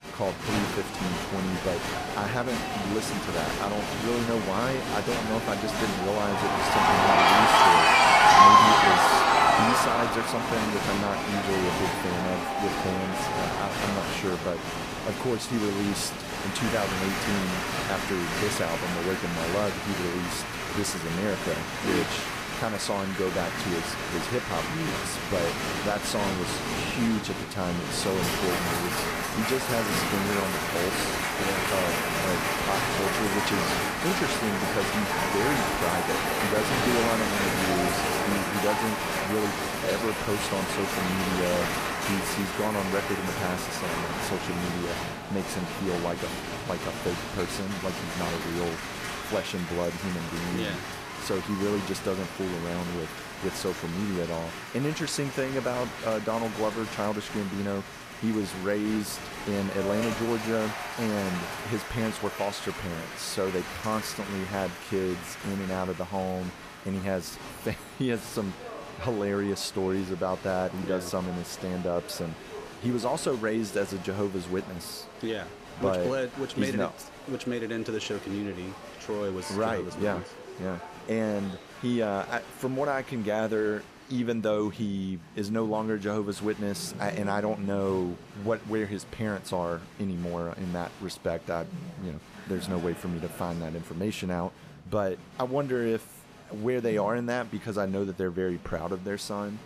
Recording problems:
crowd noise; very loud; throughout; 4 dB above the speech

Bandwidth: 14.5 kHz